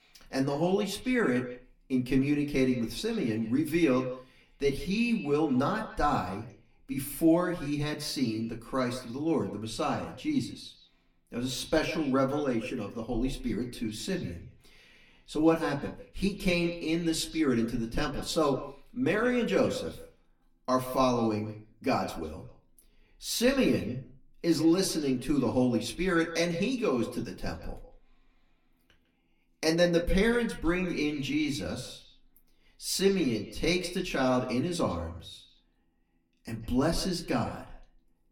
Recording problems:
off-mic speech; far
echo of what is said; noticeable; throughout; 150 ms later, 15 dB below the speech
room echo; very slight; dies away in 0.2 s

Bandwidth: 17 kHz